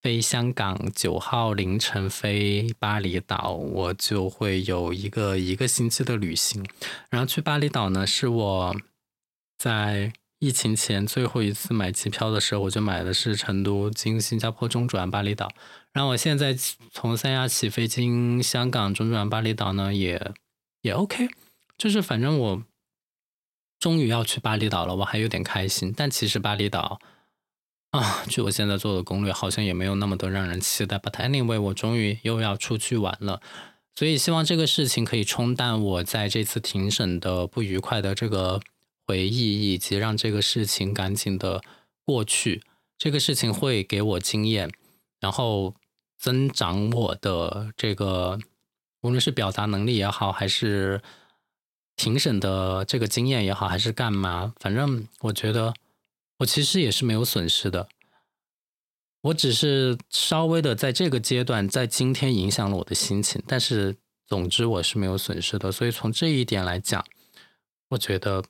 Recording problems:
none

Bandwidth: 16.5 kHz